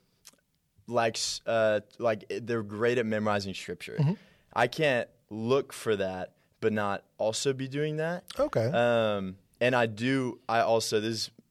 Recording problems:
none

